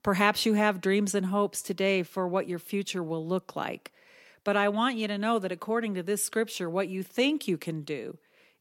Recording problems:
none

